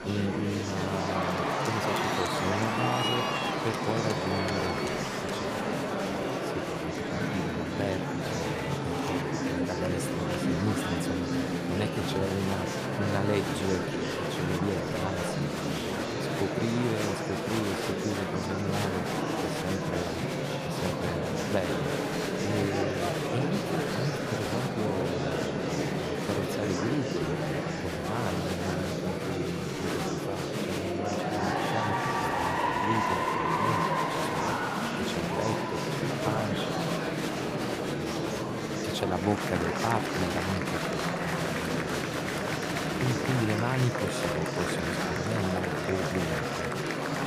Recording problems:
murmuring crowd; very loud; throughout; 5 dB above the speech
high-pitched whine; faint; throughout; 4.5 kHz, 25 dB below the speech

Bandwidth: 15 kHz